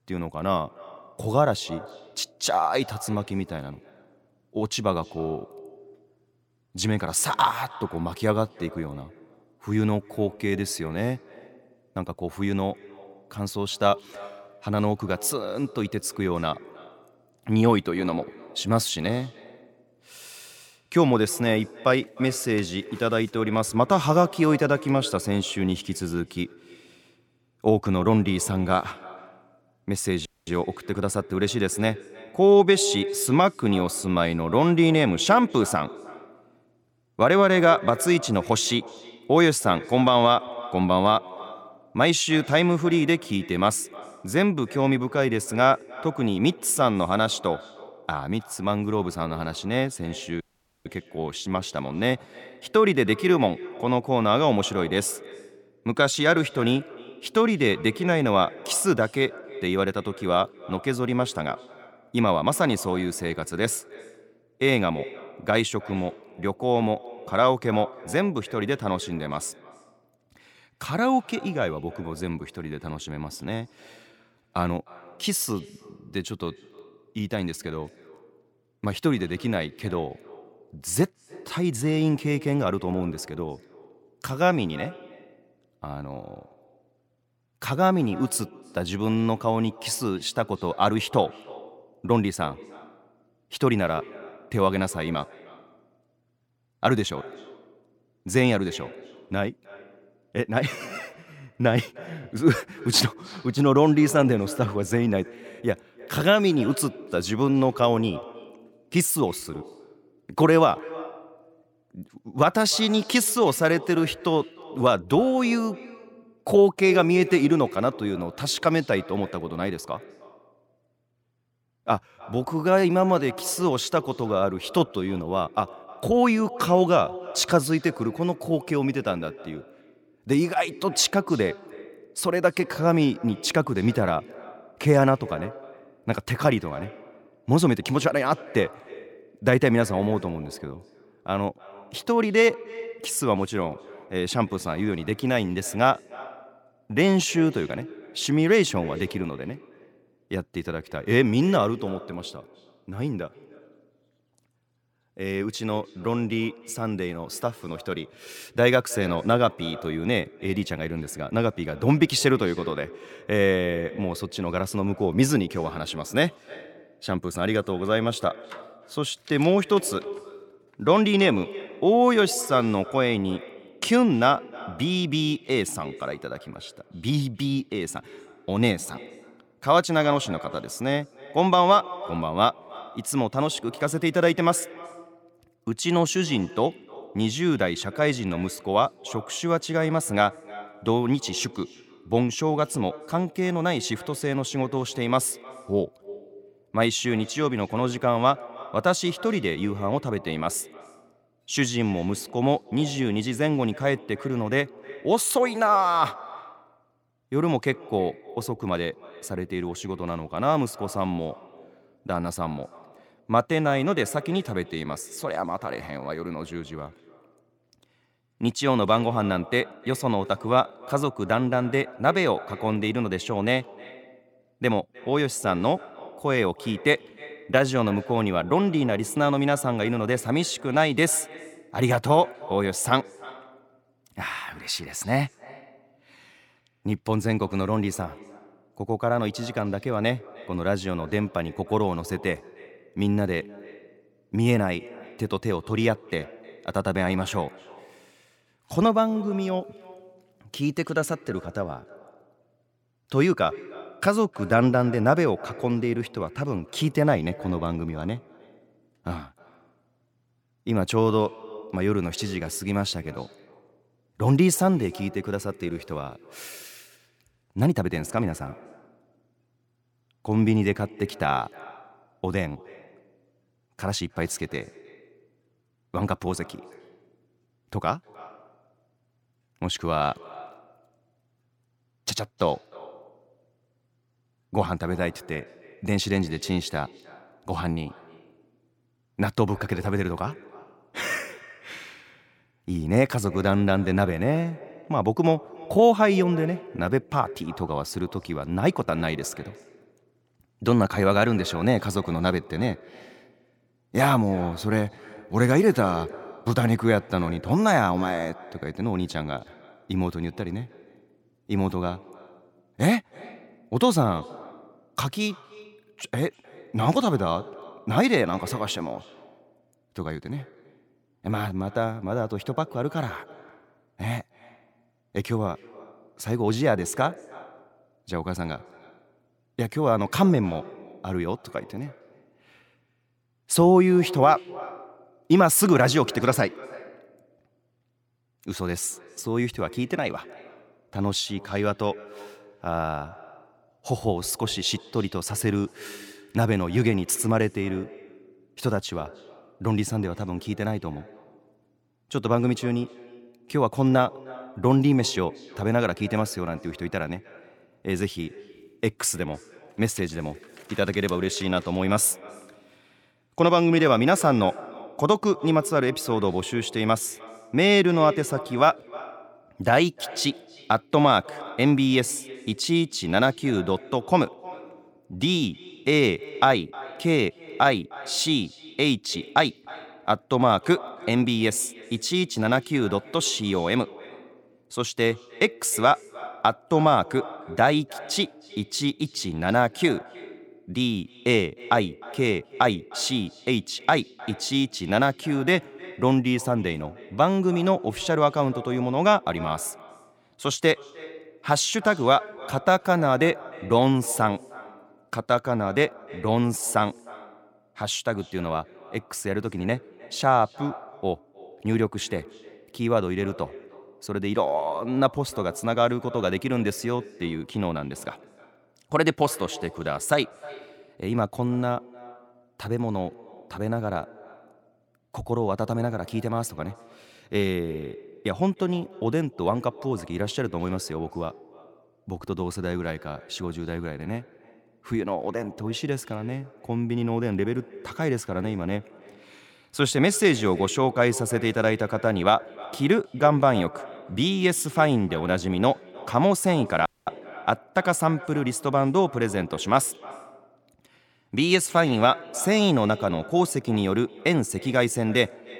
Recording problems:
echo of what is said; faint; throughout; 310 ms later, 20 dB below the speech
audio cutting out; at 30 s, at 50 s and at 7:27

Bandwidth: 17 kHz